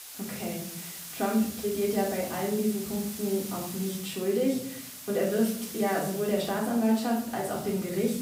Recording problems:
off-mic speech; far
room echo; noticeable; dies away in 0.6 s
hiss; loud; throughout; 10 dB below the speech

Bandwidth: 15.5 kHz